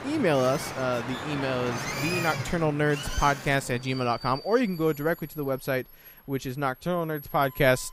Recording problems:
train or aircraft noise; loud; throughout; 9 dB below the speech

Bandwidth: 15 kHz